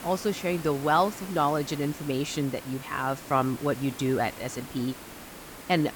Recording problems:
hiss; noticeable; throughout; 15 dB below the speech

